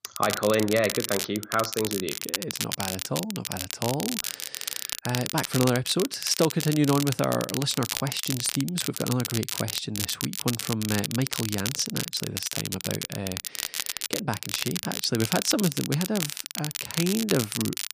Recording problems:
crackle, like an old record; loud; 3 dB below the speech

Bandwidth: 15 kHz